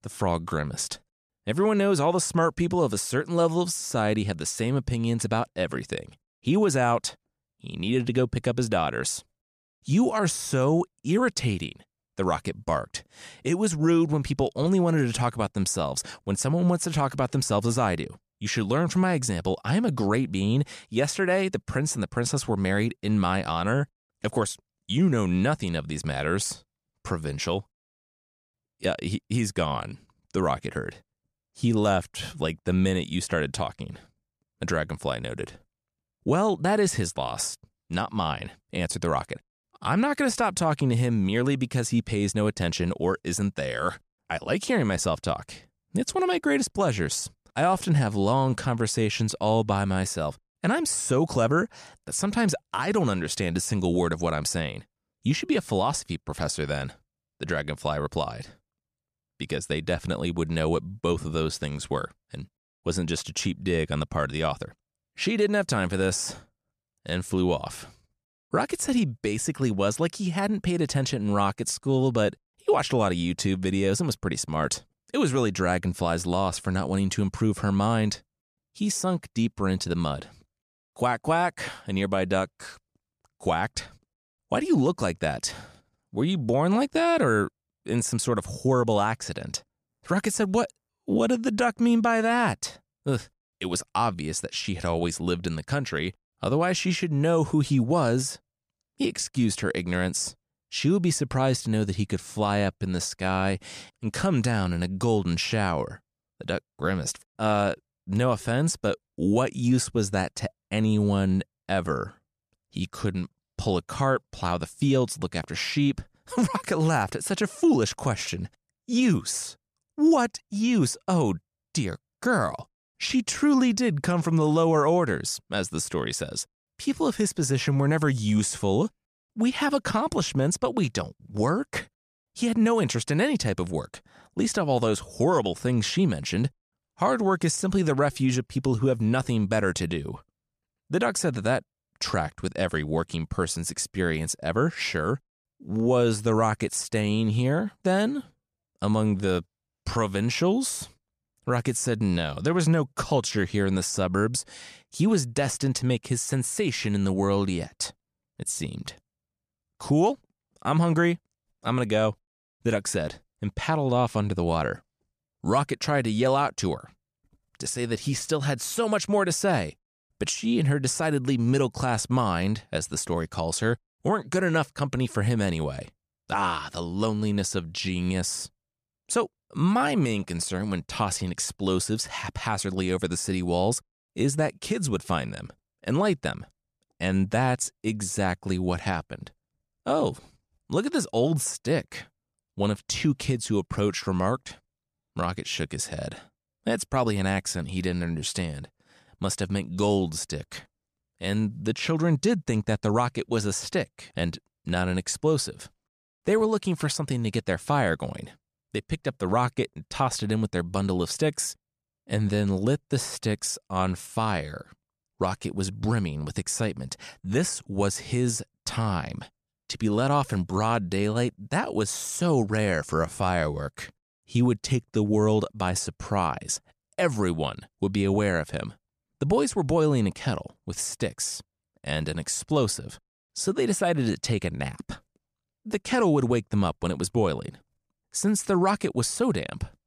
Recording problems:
none

